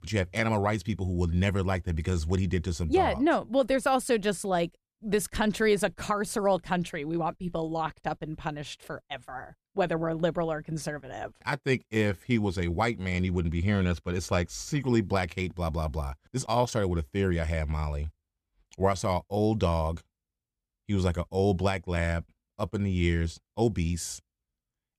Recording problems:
none

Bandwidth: 14 kHz